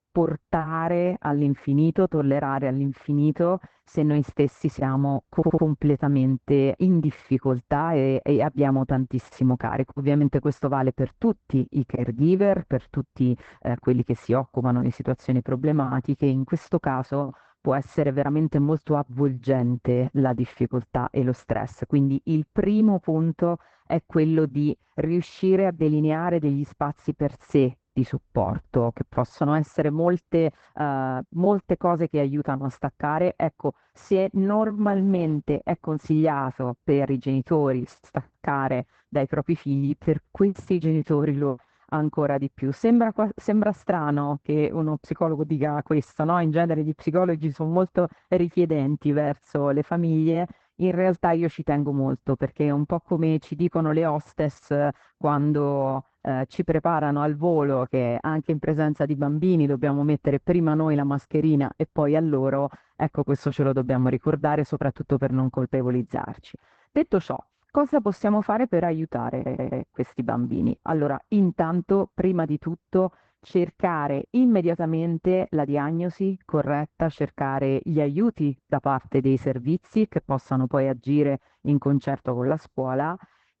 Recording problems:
garbled, watery; badly; nothing above 8 kHz
muffled; very slightly; fading above 3 kHz
audio stuttering; at 5.5 s and at 1:09

